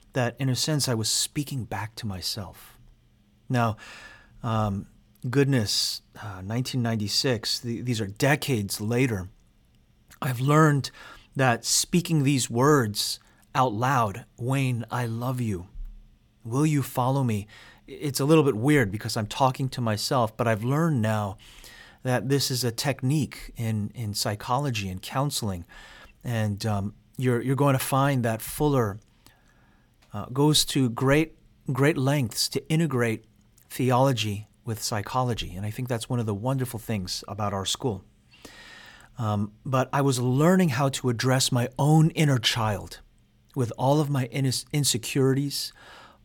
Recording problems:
none

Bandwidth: 18 kHz